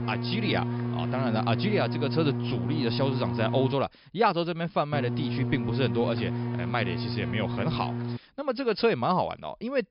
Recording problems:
high frequencies cut off; noticeable; nothing above 5.5 kHz
electrical hum; loud; until 3.5 s and from 5 to 8 s; 60 Hz, 8 dB below the speech

